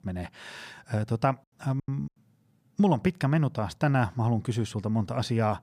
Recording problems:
choppy; very; at 2 s; 29% of the speech affected

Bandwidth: 15 kHz